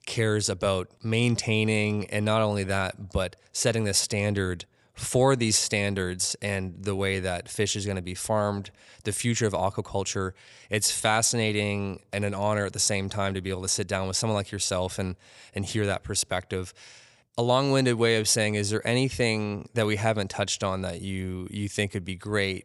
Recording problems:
none

